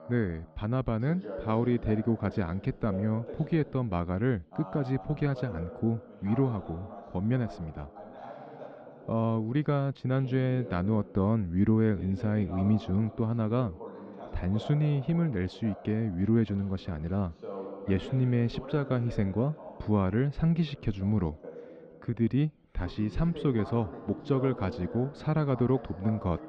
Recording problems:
muffled; slightly; fading above 3.5 kHz
voice in the background; noticeable; throughout; 15 dB below the speech

